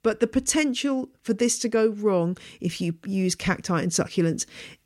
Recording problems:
none

